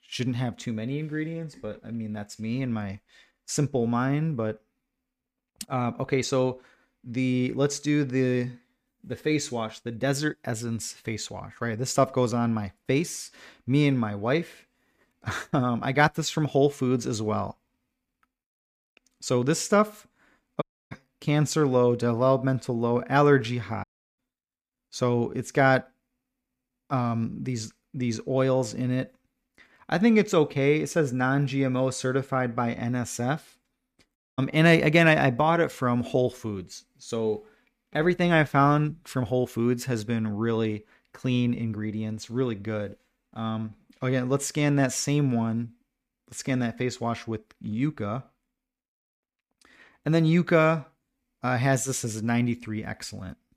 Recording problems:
audio cutting out; at 21 s, at 24 s and at 34 s

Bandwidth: 15 kHz